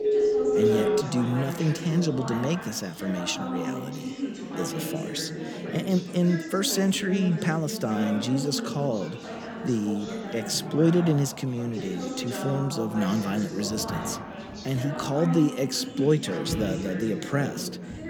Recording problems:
background chatter; loud; throughout; 4 voices, 7 dB below the speech
phone ringing; loud; until 1 s; peak 5 dB above the speech
footsteps; noticeable; from 14 s on; peak 9 dB below the speech

